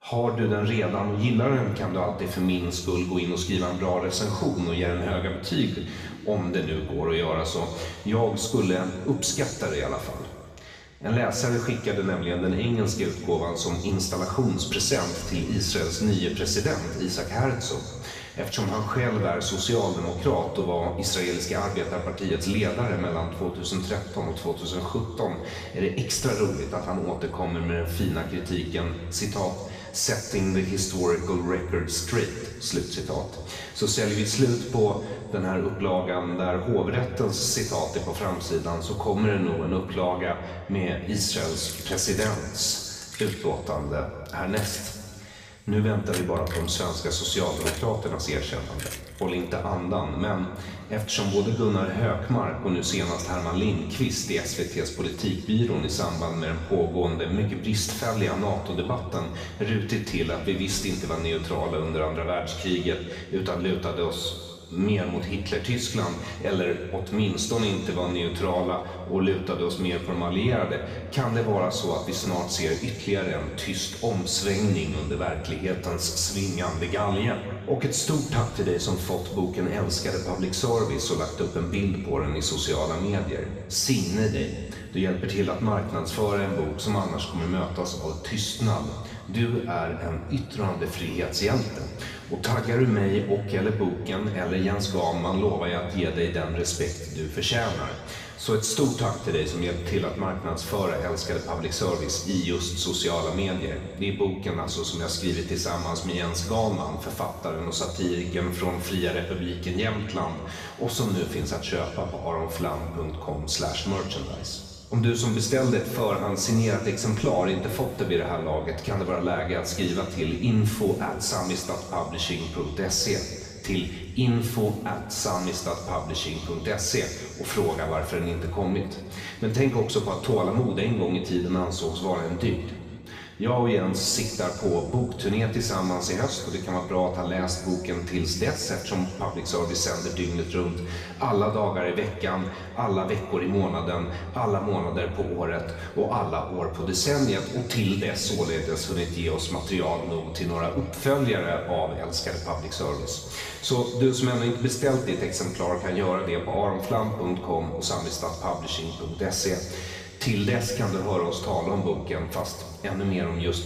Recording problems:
off-mic speech; far
room echo; noticeable; dies away in 1.9 s
jangling keys; noticeable; from 42 to 49 s; peak 5 dB below the speech

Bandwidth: 15 kHz